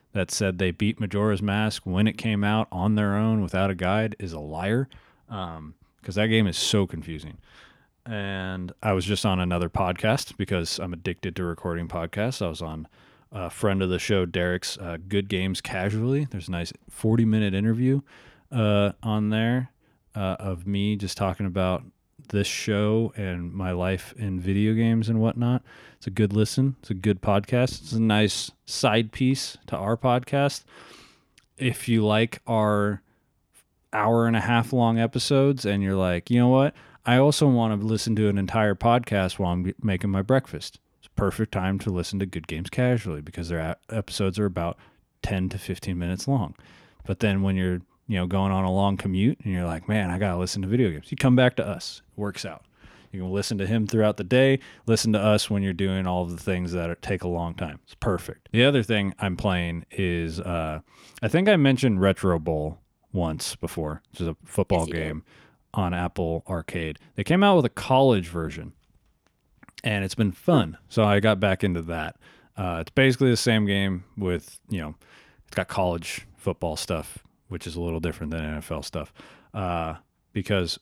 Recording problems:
uneven, jittery; strongly; from 5.5 s to 1:16

